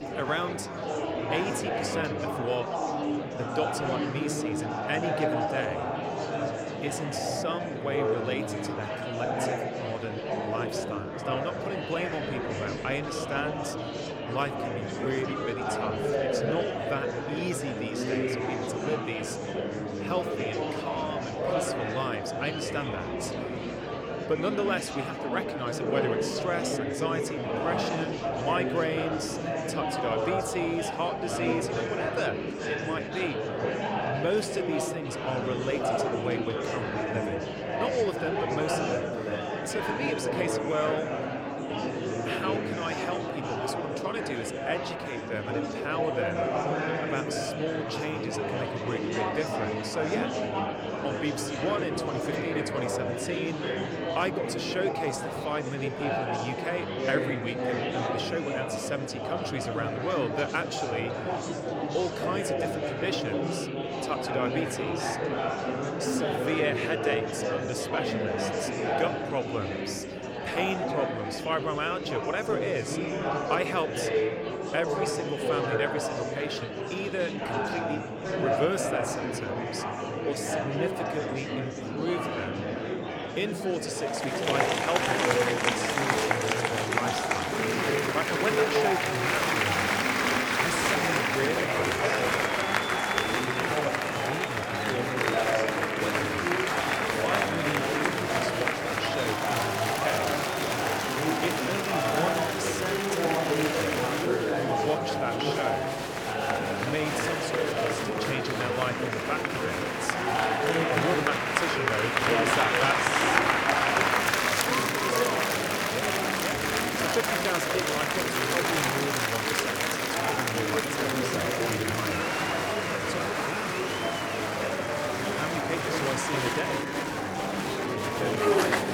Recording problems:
murmuring crowd; very loud; throughout; 5 dB above the speech

